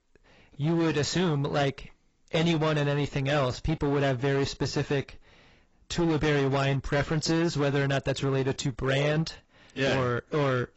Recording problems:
garbled, watery; badly; nothing above 8 kHz
distortion; slight; 15% of the sound clipped

